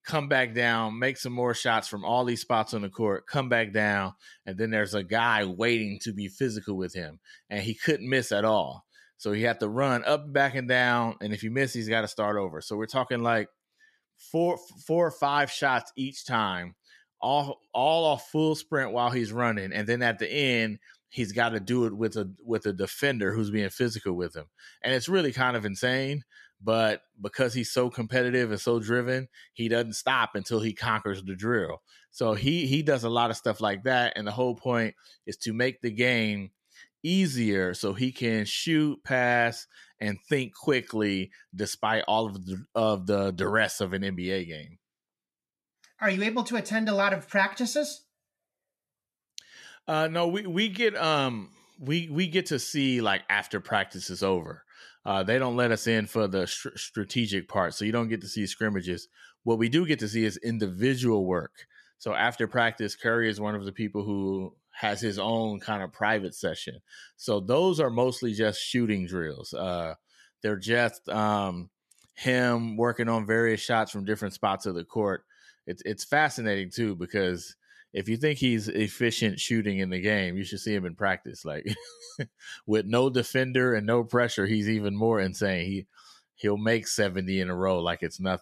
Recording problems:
none

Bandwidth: 13.5 kHz